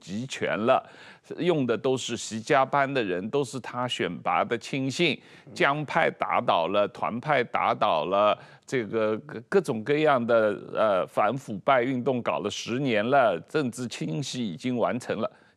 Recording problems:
none

